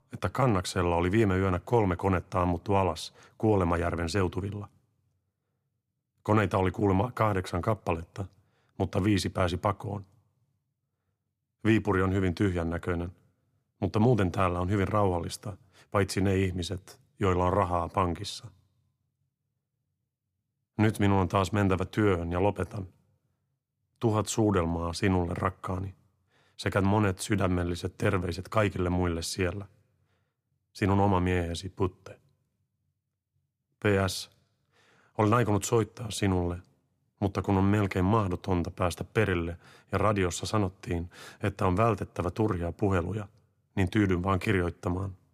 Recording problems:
none

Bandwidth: 15 kHz